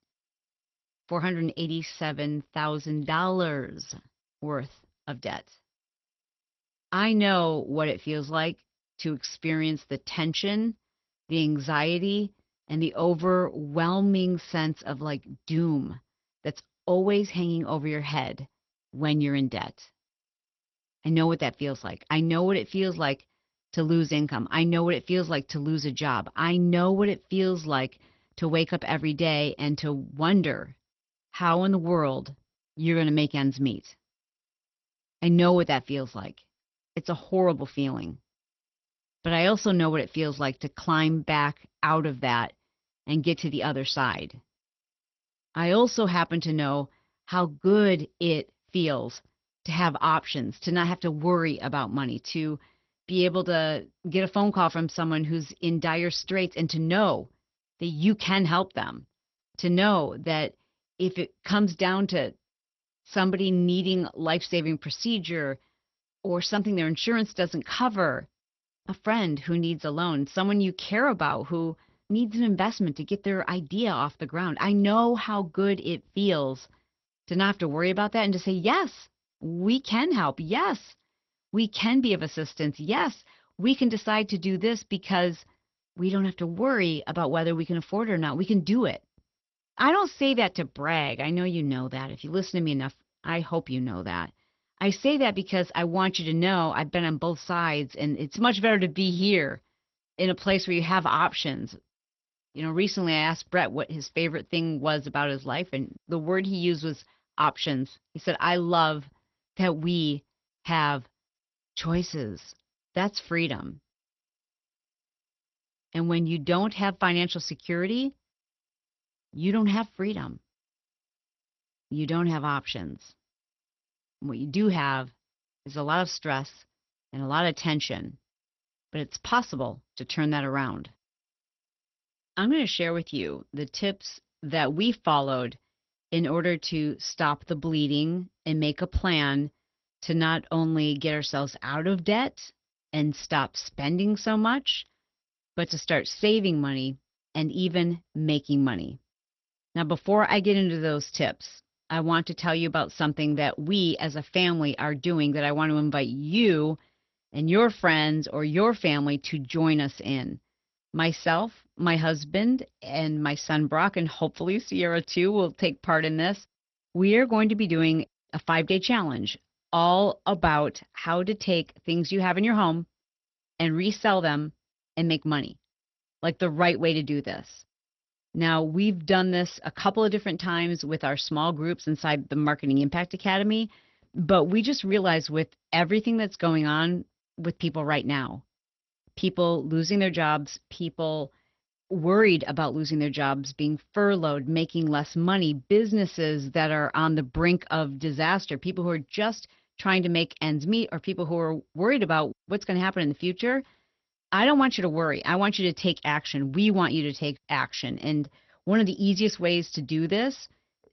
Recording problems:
garbled, watery; slightly; nothing above 6 kHz

